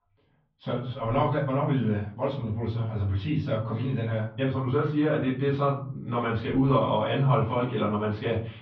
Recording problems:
off-mic speech; far
muffled; very; fading above 3.5 kHz
room echo; slight; dies away in 0.4 s

